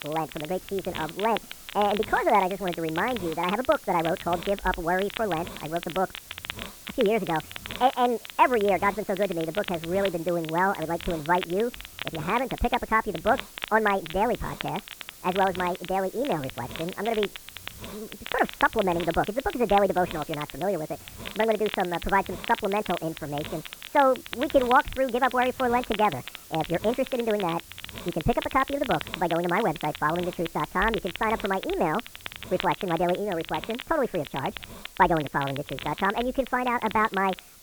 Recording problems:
muffled; very; fading above 2 kHz
high frequencies cut off; severe; nothing above 4 kHz
wrong speed and pitch; too fast and too high; 1.5 times normal speed
hiss; noticeable; throughout; 15 dB below the speech
crackle, like an old record; noticeable; 15 dB below the speech

